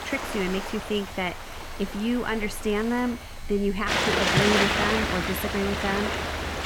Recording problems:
rain or running water; very loud; throughout; 3 dB above the speech
household noises; noticeable; throughout; 20 dB below the speech

